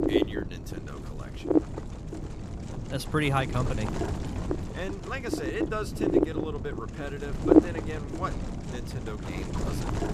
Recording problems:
wind noise on the microphone; heavy; 3 dB above the speech

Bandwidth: 14.5 kHz